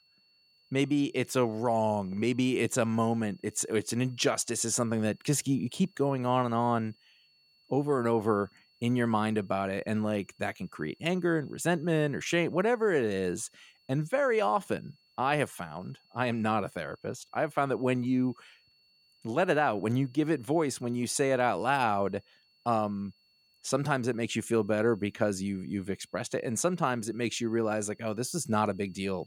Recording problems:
high-pitched whine; faint; throughout; 4.5 kHz, 35 dB below the speech

